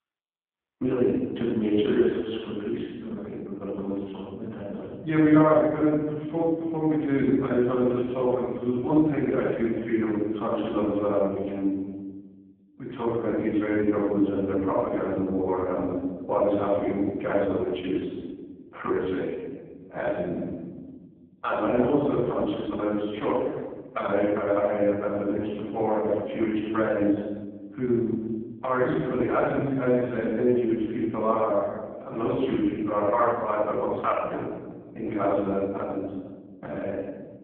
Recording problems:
phone-call audio; poor line
room echo; strong; dies away in 1.3 s
off-mic speech; far

